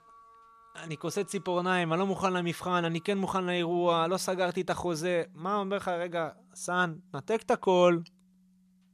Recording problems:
background music; faint; throughout; 25 dB below the speech

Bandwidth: 14 kHz